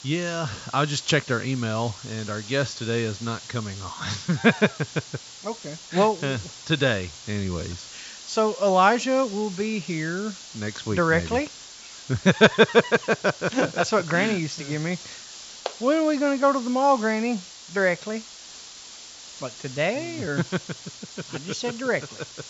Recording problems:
high frequencies cut off; noticeable; nothing above 8 kHz
hiss; noticeable; throughout; 15 dB below the speech

